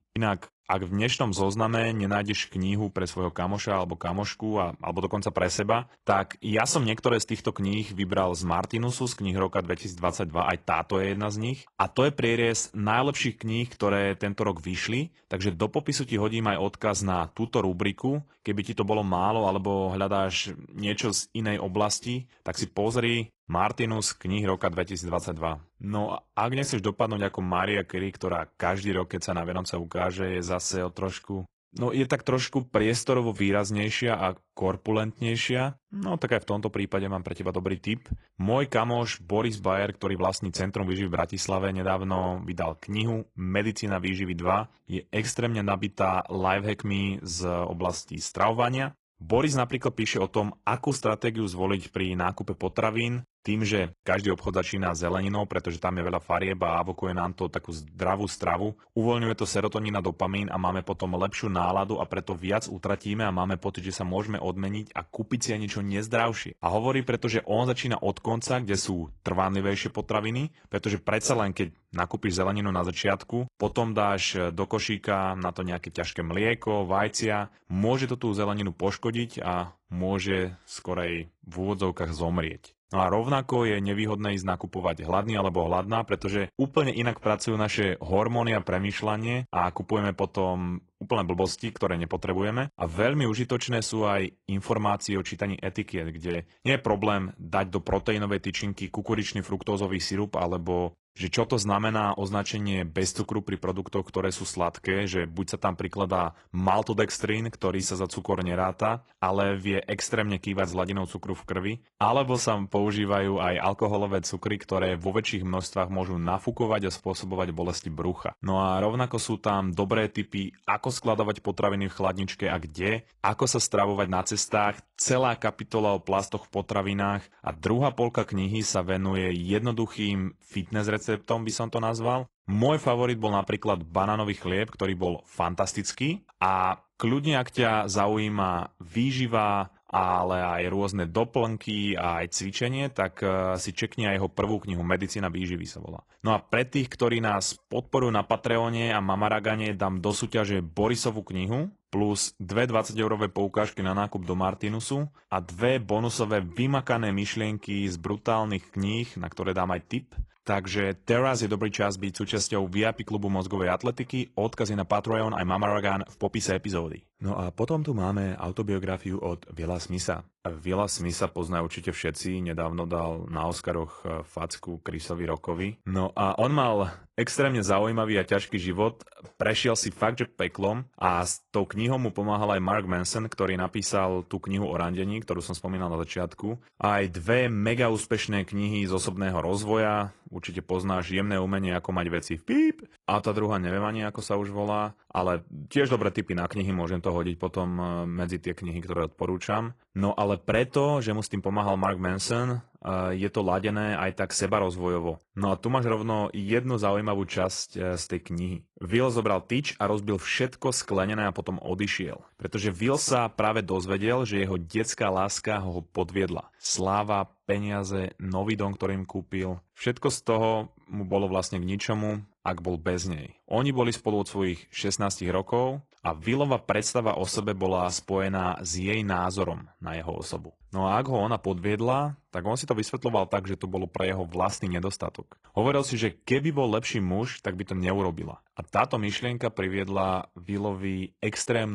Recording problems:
garbled, watery; slightly; nothing above 10.5 kHz
abrupt cut into speech; at the end

